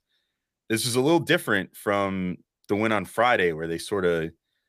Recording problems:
none

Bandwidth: 15 kHz